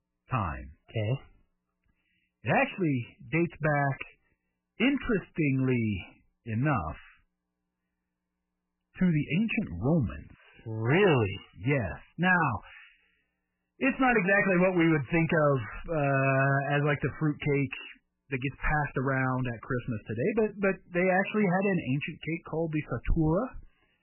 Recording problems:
garbled, watery; badly; nothing above 3 kHz
distortion; slight; 4% of the sound clipped

